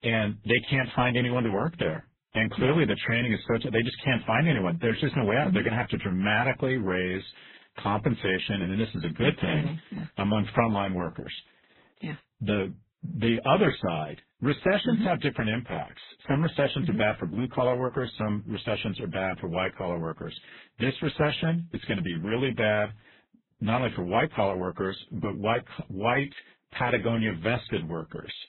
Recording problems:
garbled, watery; badly; nothing above 3.5 kHz
high frequencies cut off; slight

